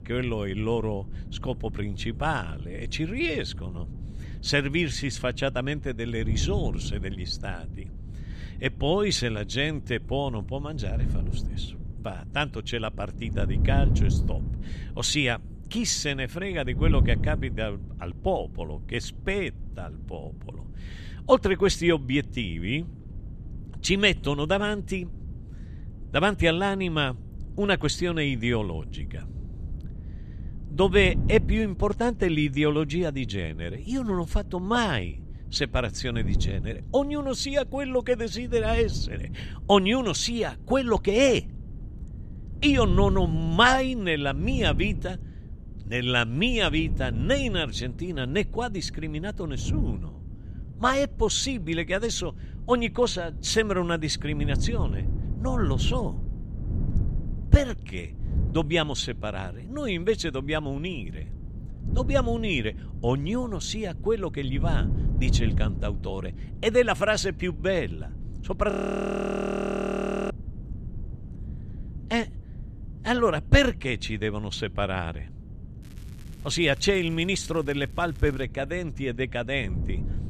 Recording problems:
wind noise on the microphone; occasional gusts; 20 dB below the speech
crackling; faint; from 1:16 to 1:18; 30 dB below the speech
audio freezing; at 1:09 for 1.5 s

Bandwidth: 14 kHz